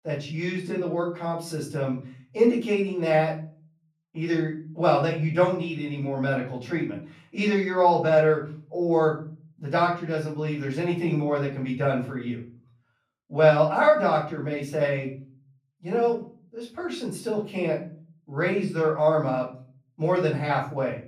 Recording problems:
off-mic speech; far
room echo; slight; dies away in 0.4 s

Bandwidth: 15 kHz